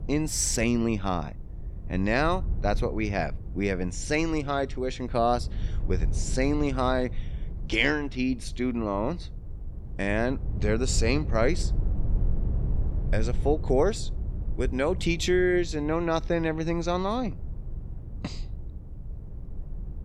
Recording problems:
low rumble; faint; throughout; 20 dB below the speech

